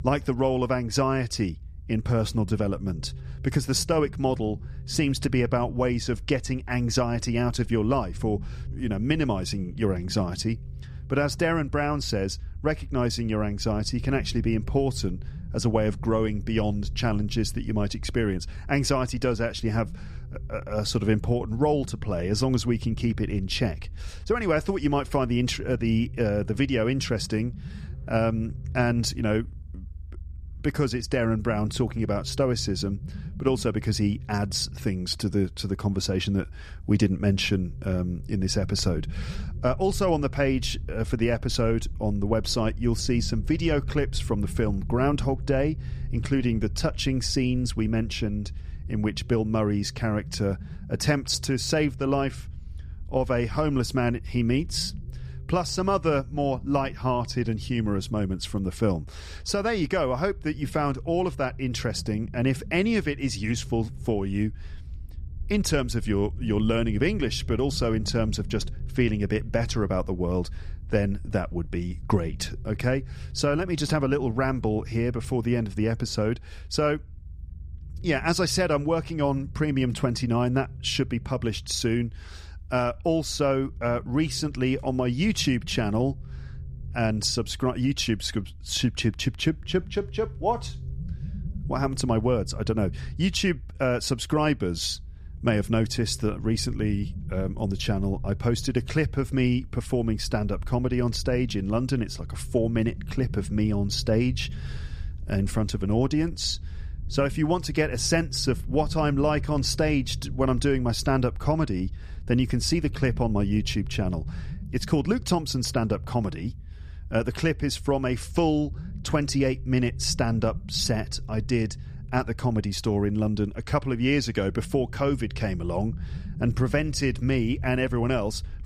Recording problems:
low rumble; faint; throughout; 25 dB below the speech

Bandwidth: 14.5 kHz